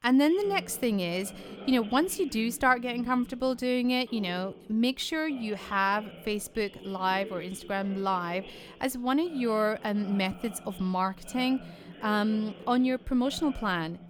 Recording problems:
background chatter; noticeable; throughout; 2 voices, 15 dB below the speech

